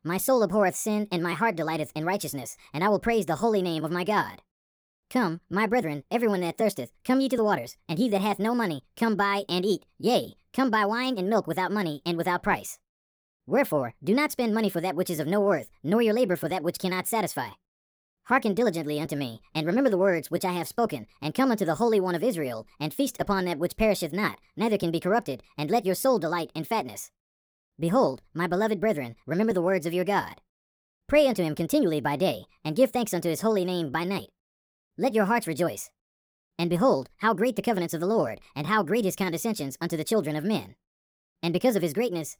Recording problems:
wrong speed and pitch; too fast and too high; 1.5 times normal speed

